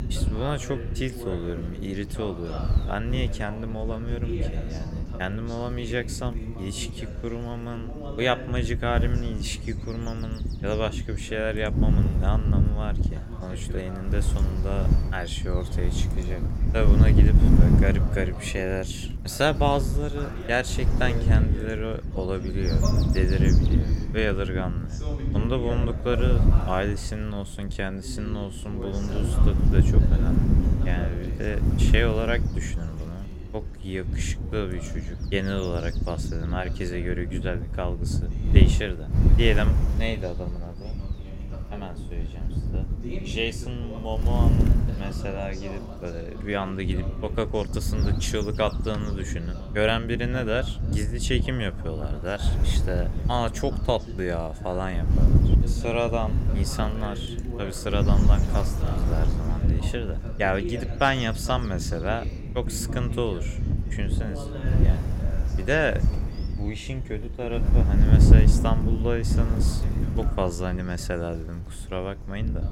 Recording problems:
wind noise on the microphone; heavy; 8 dB below the speech
voice in the background; noticeable; throughout; 10 dB below the speech

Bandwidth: 16 kHz